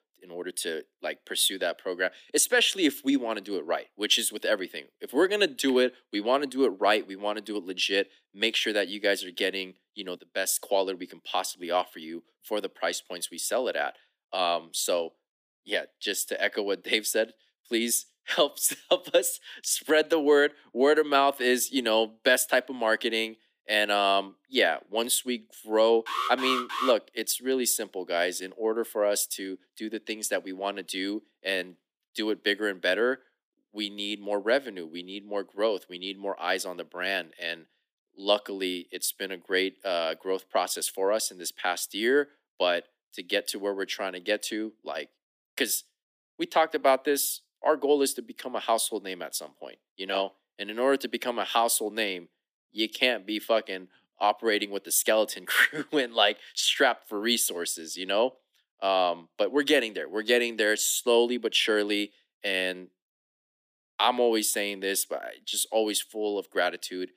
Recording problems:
thin; somewhat; fading below 250 Hz
alarm; noticeable; at 26 s; peak 2 dB below the speech

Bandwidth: 15 kHz